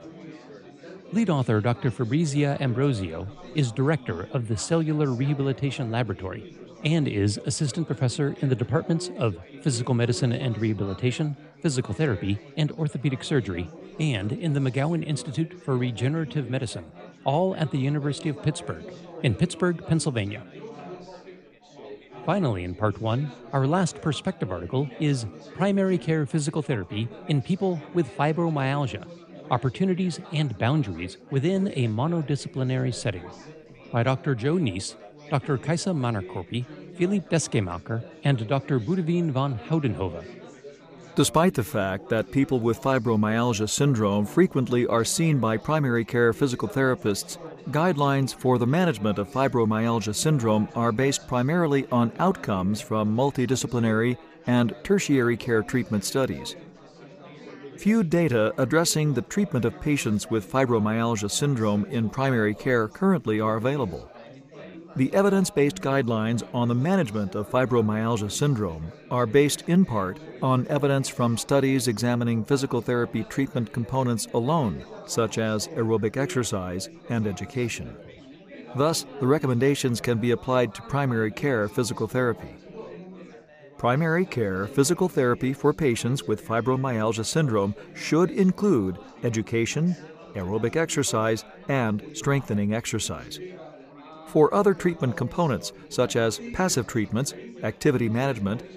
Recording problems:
chatter from many people; noticeable; throughout; 20 dB below the speech

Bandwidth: 15 kHz